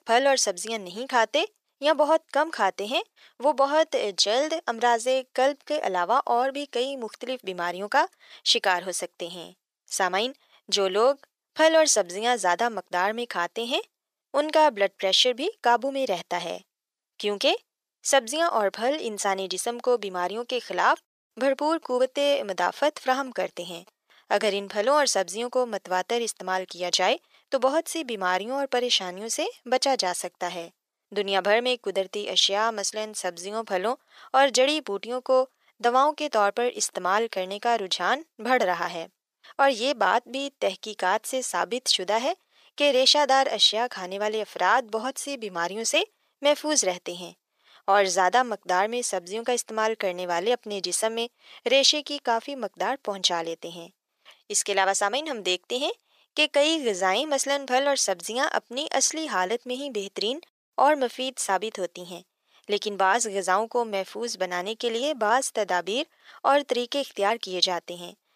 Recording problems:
thin; somewhat; fading below 500 Hz

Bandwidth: 14.5 kHz